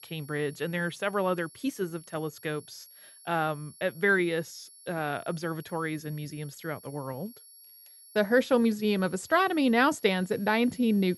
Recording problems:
high-pitched whine; faint; throughout; 11 kHz, 20 dB below the speech

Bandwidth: 14 kHz